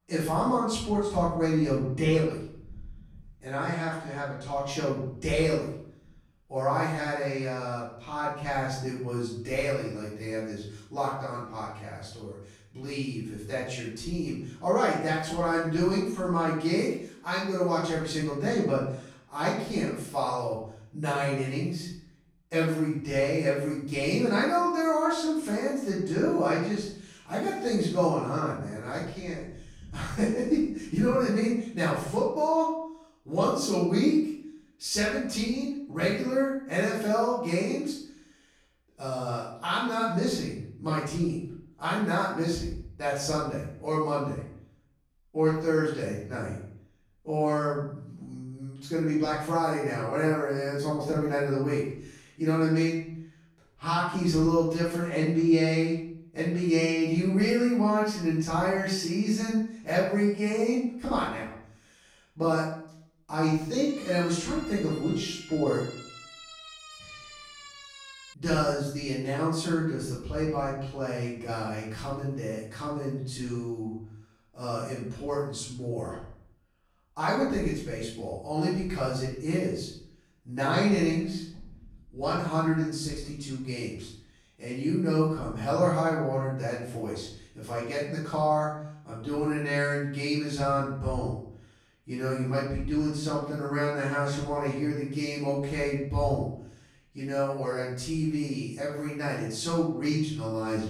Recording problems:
off-mic speech; far
room echo; noticeable; dies away in 0.6 s
siren; faint; from 1:04 to 1:08; peak 15 dB below the speech

